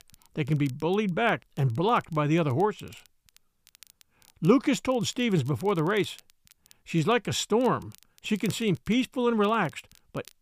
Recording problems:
crackle, like an old record; faint; 30 dB below the speech

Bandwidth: 15 kHz